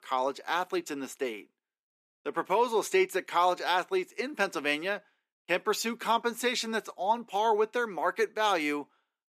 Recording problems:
thin; somewhat; fading below 250 Hz

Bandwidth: 14.5 kHz